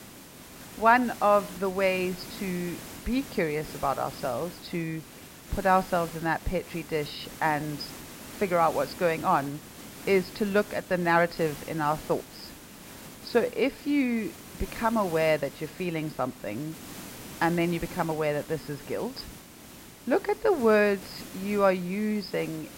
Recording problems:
high frequencies cut off; noticeable; nothing above 5.5 kHz
hiss; noticeable; throughout; 15 dB below the speech

